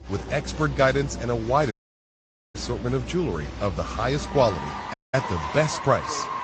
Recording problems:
garbled, watery; slightly; nothing above 7.5 kHz
crowd noise; loud; throughout; 9 dB below the speech
voice in the background; faint; throughout; 20 dB below the speech
audio cutting out; at 1.5 s for 1 s and at 5 s

